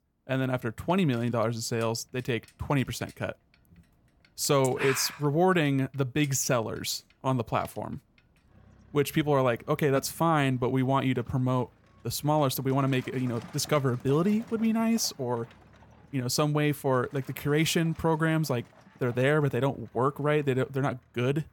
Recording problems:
traffic noise; faint; throughout; 25 dB below the speech

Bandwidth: 17.5 kHz